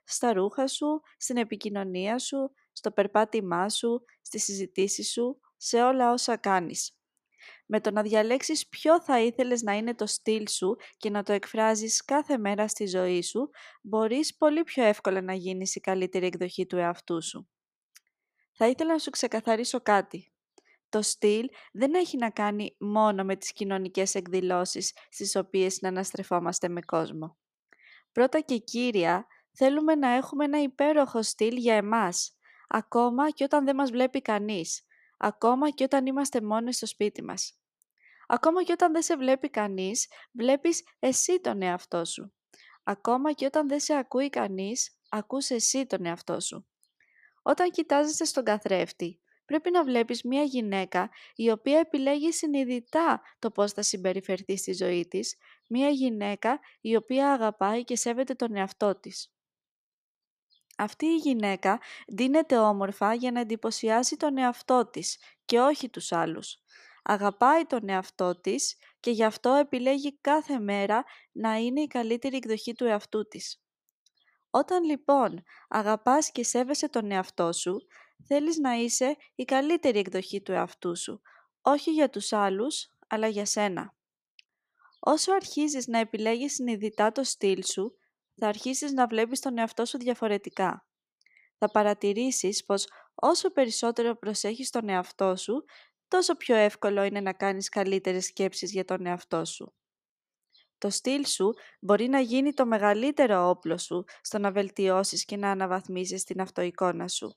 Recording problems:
none

